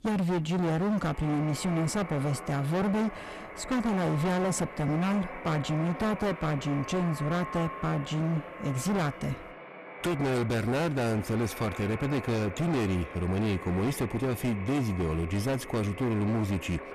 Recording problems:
distortion; heavy; 30% of the sound clipped
echo of what is said; strong; throughout; 280 ms later, 10 dB below the speech

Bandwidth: 14.5 kHz